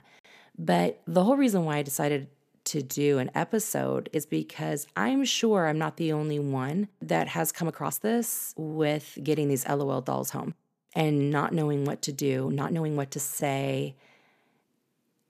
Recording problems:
uneven, jittery; strongly; from 0.5 to 14 s

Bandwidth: 14.5 kHz